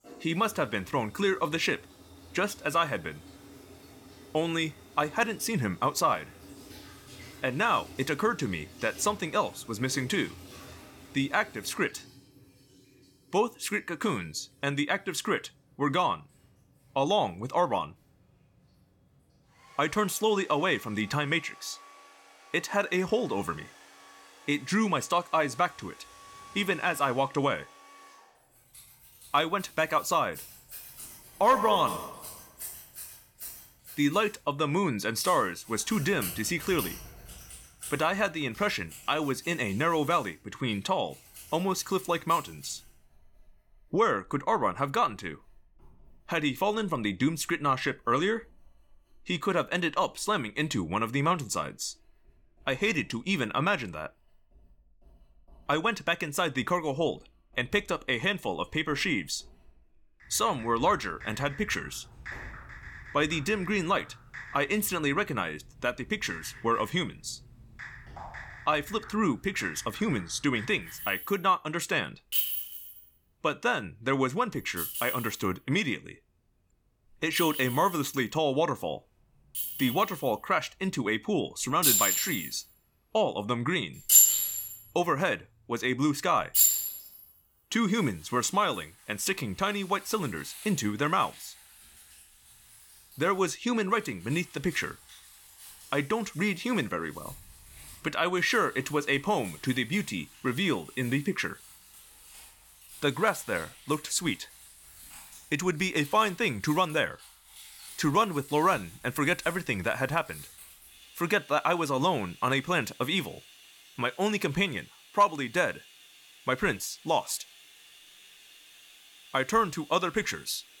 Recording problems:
household noises; loud; throughout; 4 dB below the speech

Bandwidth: 18 kHz